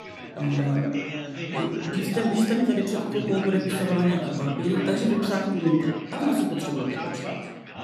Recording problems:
room echo; noticeable; dies away in 0.8 s
off-mic speech; somewhat distant
chatter from many people; loud; throughout; 8 dB below the speech

